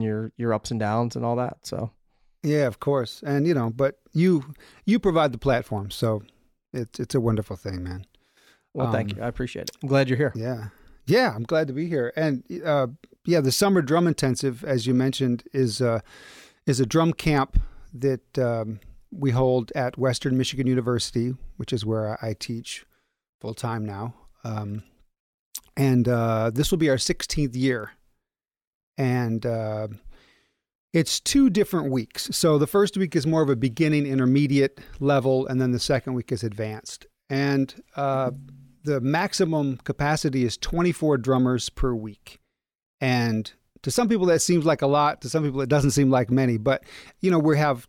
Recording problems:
abrupt cut into speech; at the start

